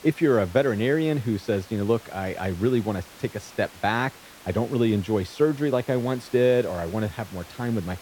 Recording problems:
hiss; noticeable; throughout; 20 dB below the speech

